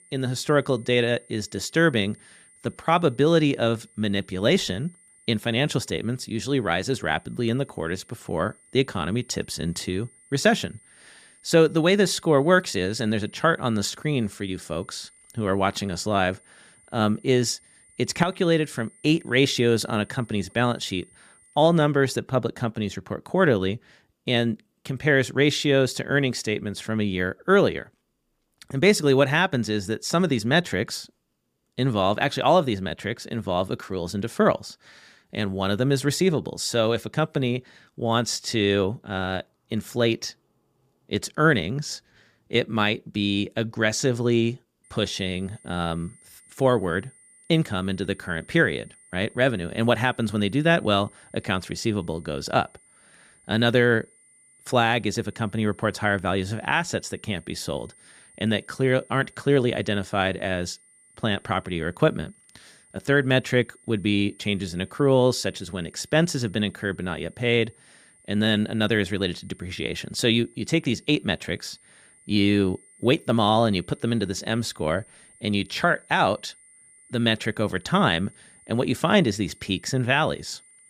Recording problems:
high-pitched whine; faint; until 22 s and from 45 s on; 9 kHz, 30 dB below the speech

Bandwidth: 15 kHz